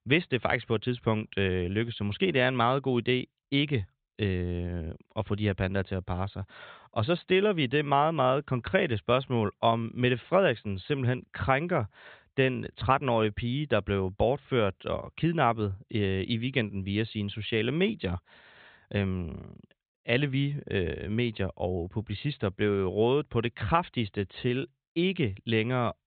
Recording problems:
high frequencies cut off; severe; nothing above 4 kHz

